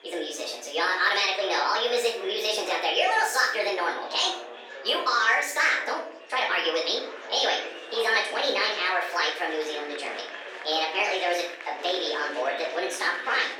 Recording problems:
off-mic speech; far
thin; very; fading below 450 Hz
wrong speed and pitch; too fast and too high; 1.5 times normal speed
room echo; noticeable; dies away in 0.6 s
murmuring crowd; noticeable; throughout; 15 dB below the speech

